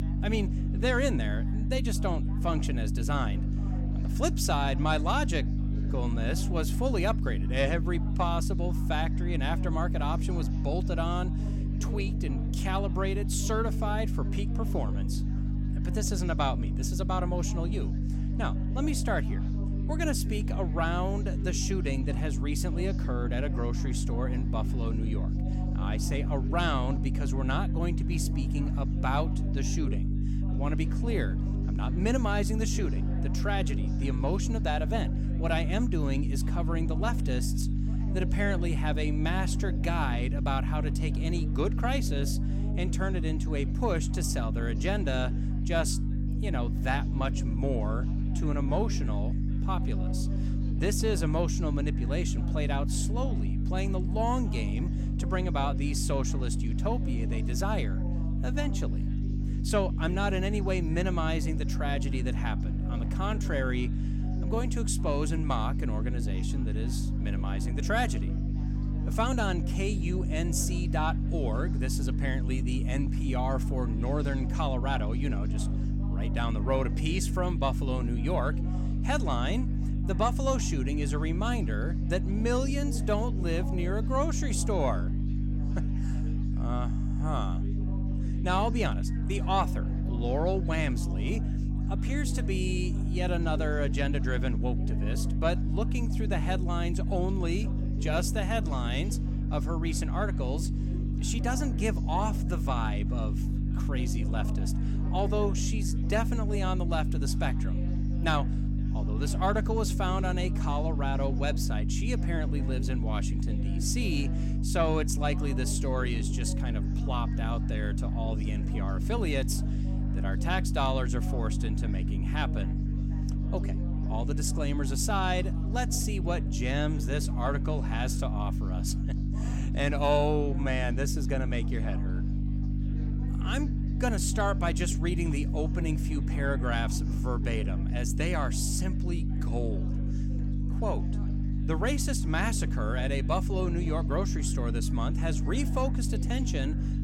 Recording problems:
electrical hum; loud; throughout; 50 Hz, 8 dB below the speech
chatter from many people; noticeable; throughout; 20 dB below the speech

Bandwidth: 16.5 kHz